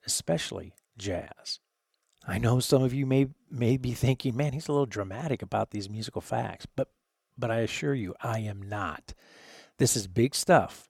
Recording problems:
none

